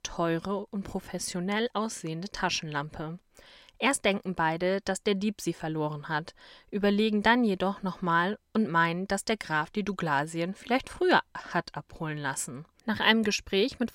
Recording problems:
none

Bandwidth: 16 kHz